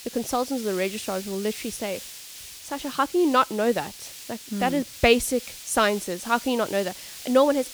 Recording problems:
hiss; noticeable; throughout; 15 dB below the speech

